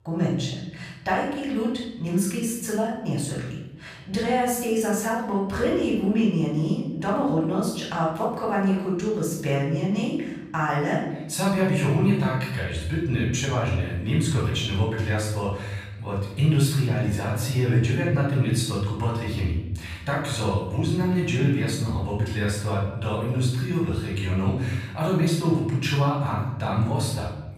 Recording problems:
off-mic speech; far
room echo; noticeable; dies away in 1 s

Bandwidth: 15 kHz